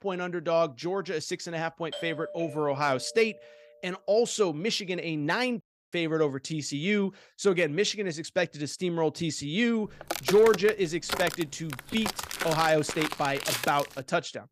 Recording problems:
doorbell; faint; from 2 to 3.5 s; peak 10 dB below the speech
audio cutting out; at 5.5 s
footsteps; noticeable; from 10 to 14 s; peak 2 dB below the speech

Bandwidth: 15 kHz